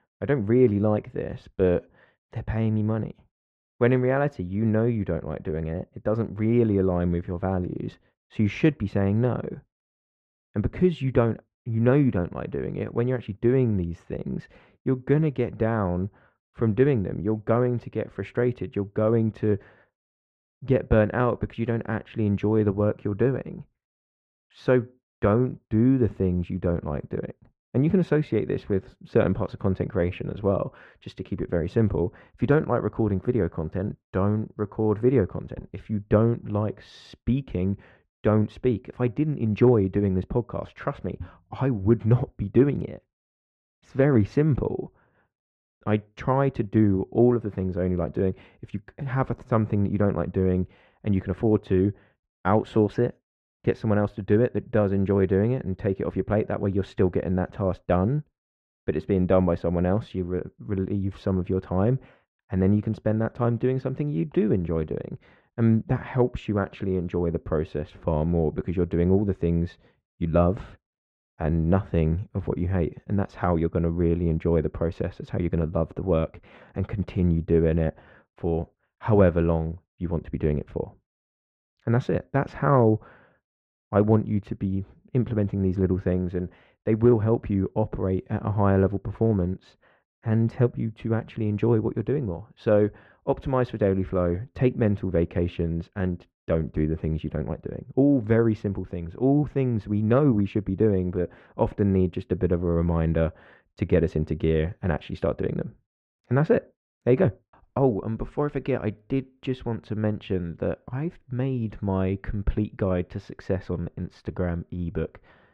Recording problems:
muffled; very; fading above 2 kHz

